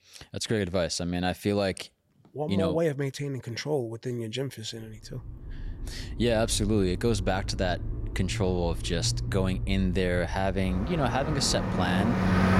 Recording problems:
traffic noise; loud; from 5 s on; 5 dB below the speech

